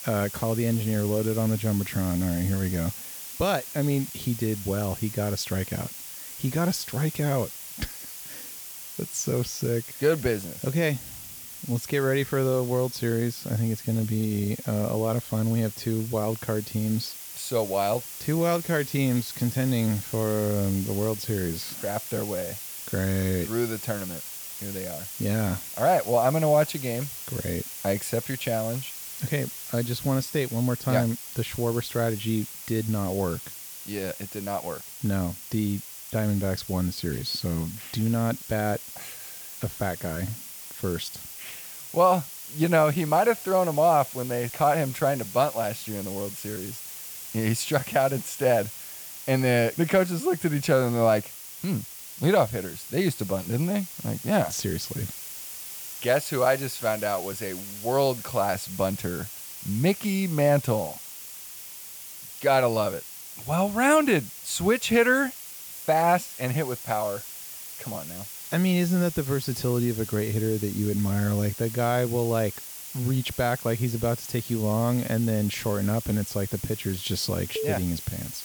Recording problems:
hiss; loud; throughout; 10 dB below the speech

